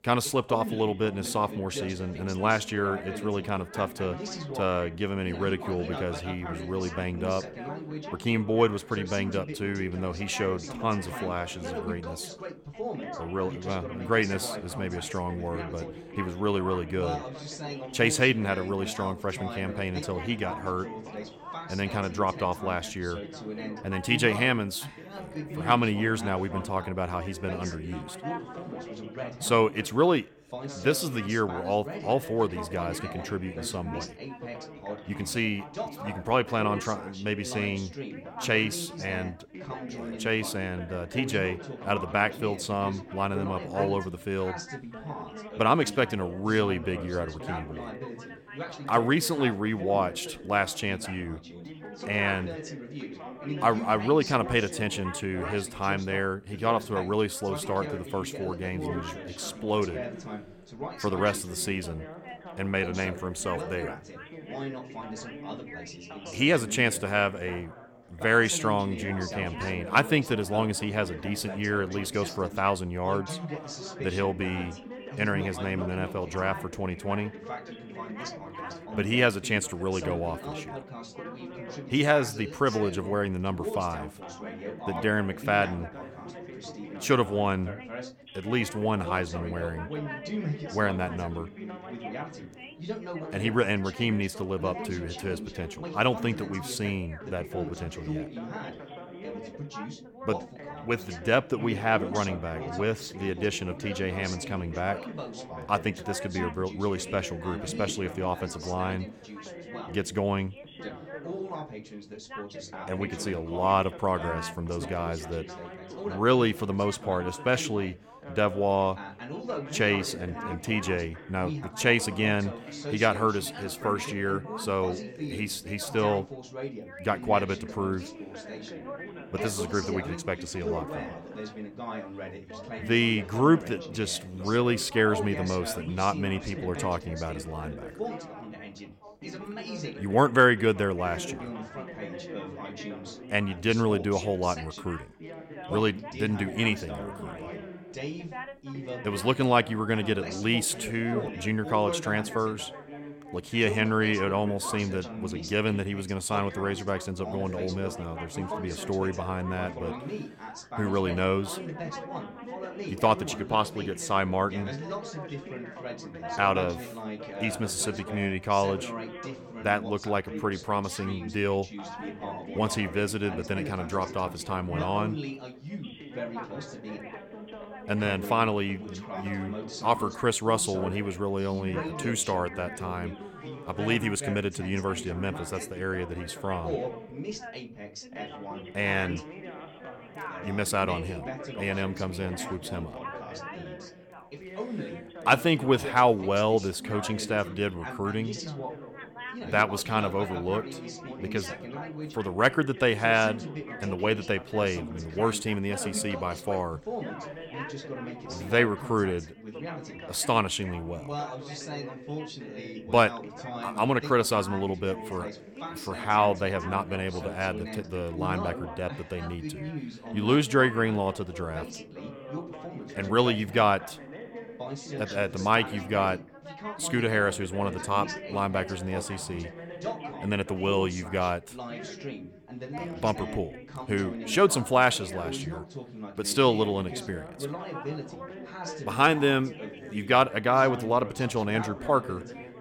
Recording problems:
background chatter; noticeable; throughout; 3 voices, 10 dB below the speech

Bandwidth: 17.5 kHz